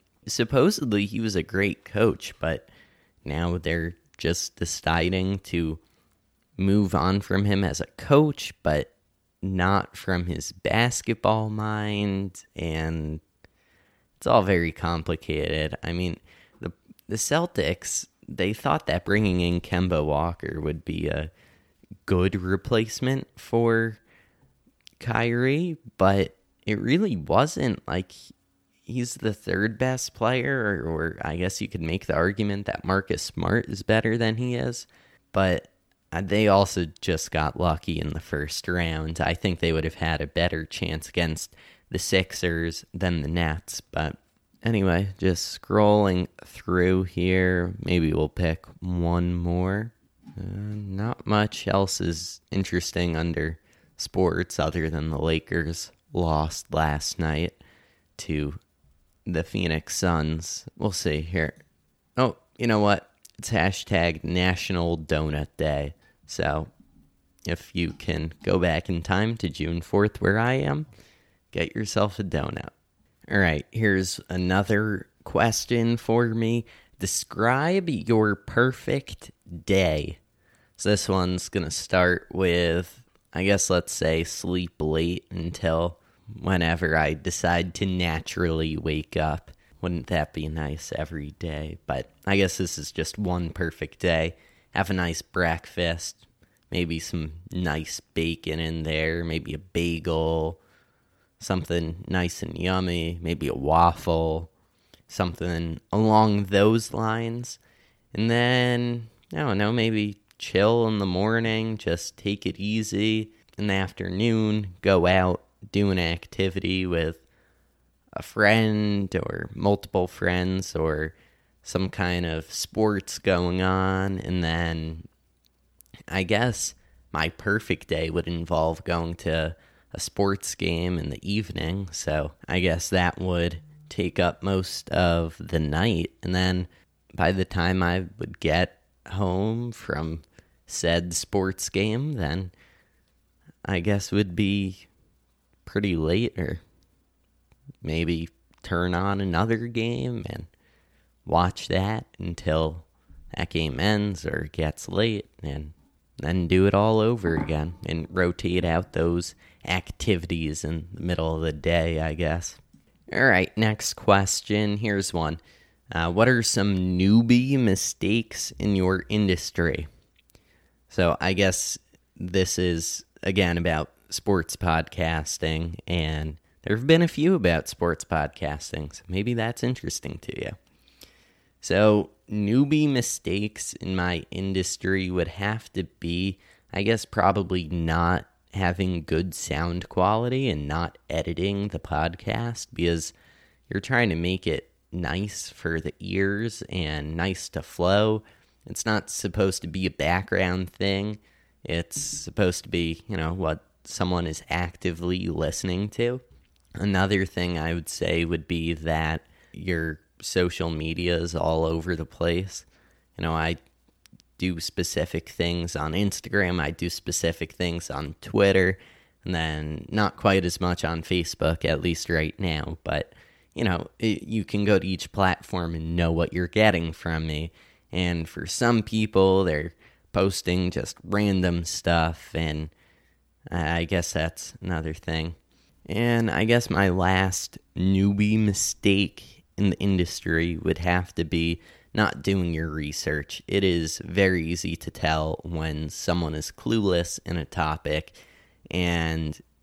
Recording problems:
none

